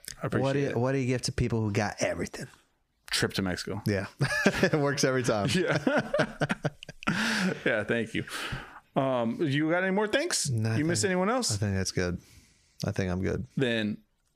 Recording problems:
squashed, flat; heavily

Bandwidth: 15 kHz